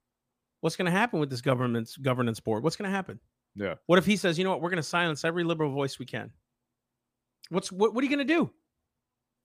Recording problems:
none

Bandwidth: 15 kHz